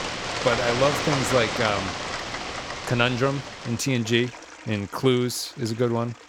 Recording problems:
rain or running water; loud; throughout; 4 dB below the speech

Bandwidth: 17 kHz